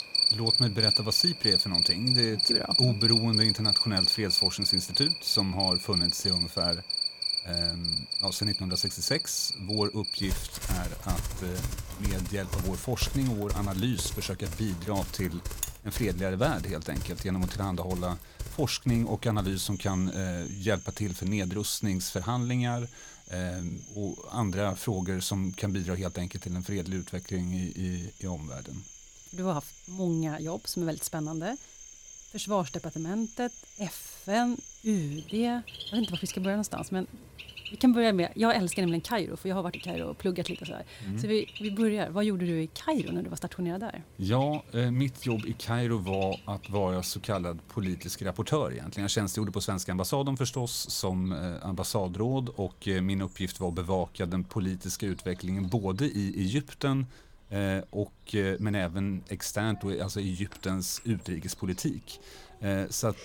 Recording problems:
animal sounds; very loud; throughout; 3 dB above the speech

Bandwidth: 17 kHz